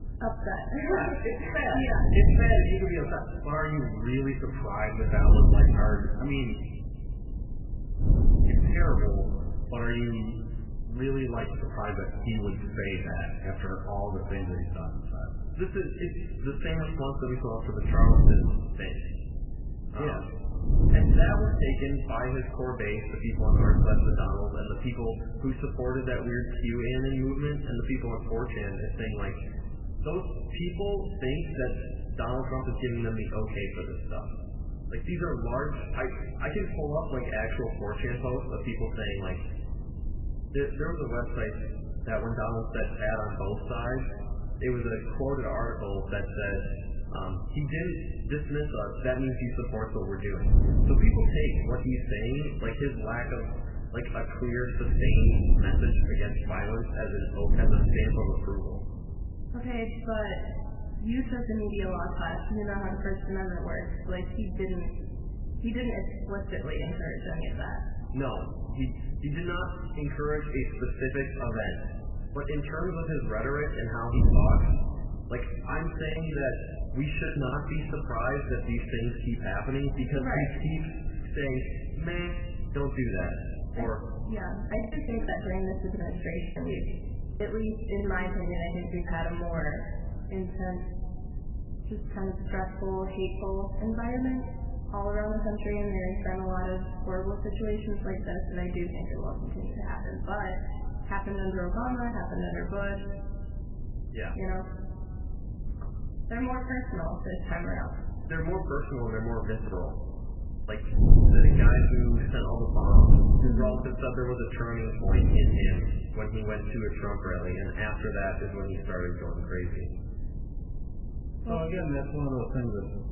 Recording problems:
garbled, watery; badly; nothing above 3 kHz
room echo; noticeable; dies away in 1.6 s
off-mic speech; somewhat distant
wind noise on the microphone; occasional gusts; 10 dB below the speech
choppy; very; from 1:16 to 1:18, from 1:25 to 1:28 and from 1:50 to 1:54; 11% of the speech affected

